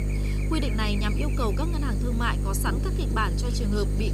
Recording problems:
electrical hum; loud; throughout; 50 Hz, 7 dB below the speech

